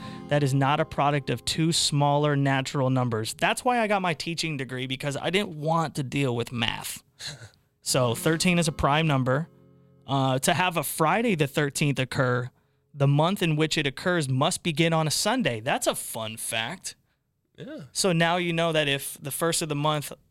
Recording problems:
background music; faint; throughout; 25 dB below the speech

